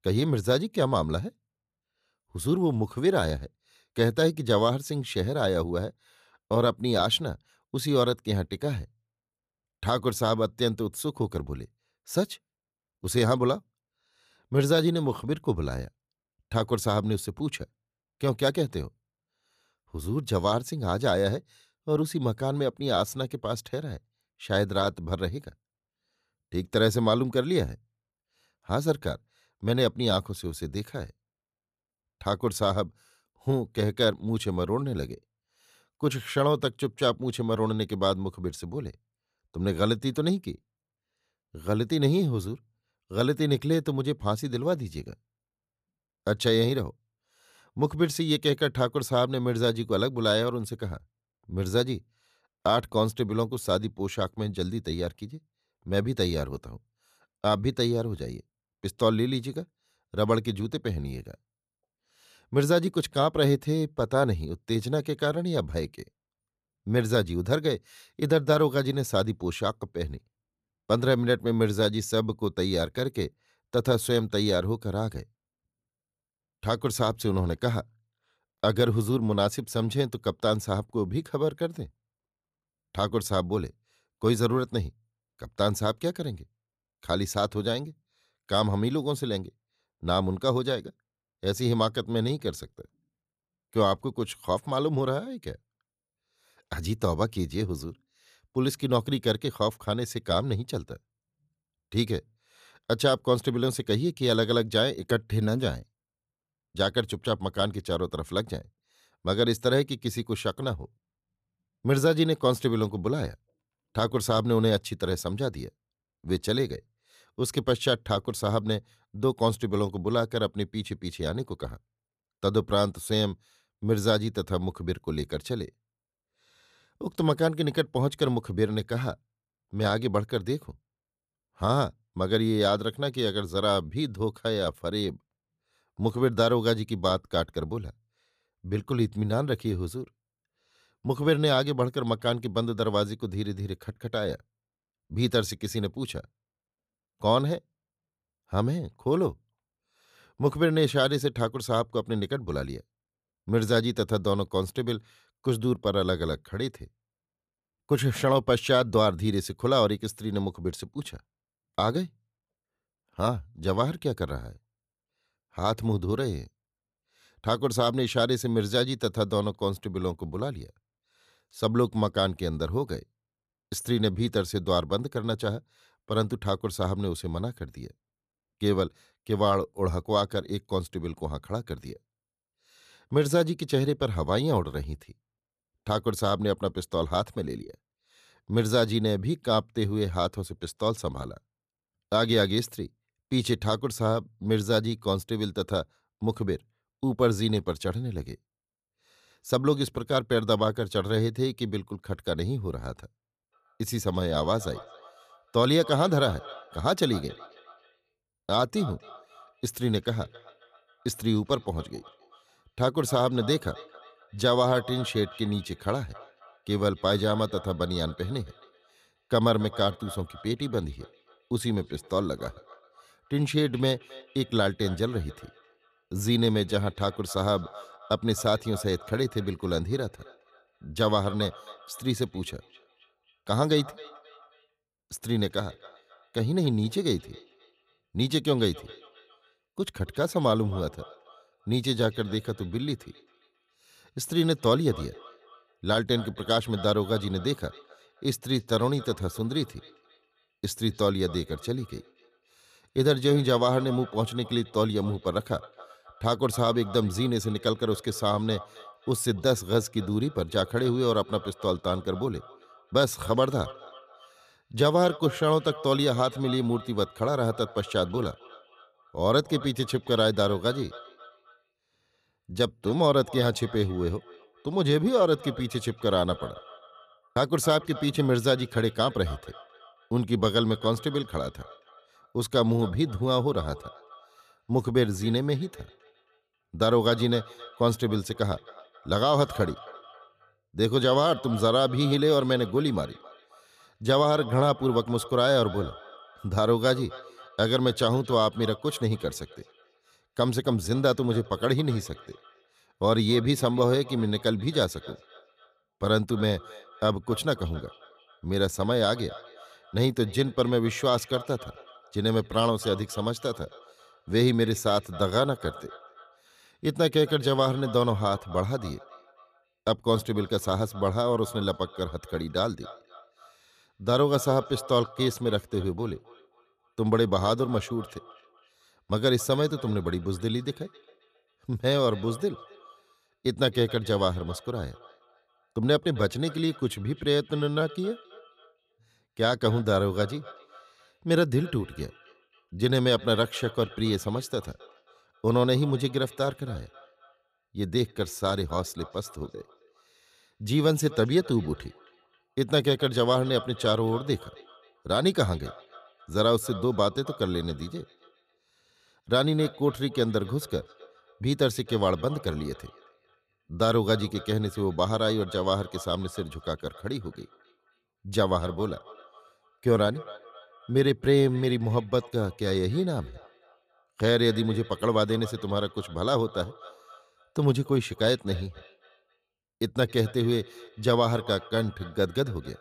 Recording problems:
echo of what is said; faint; from 3:24 on; 270 ms later, 20 dB below the speech

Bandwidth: 14.5 kHz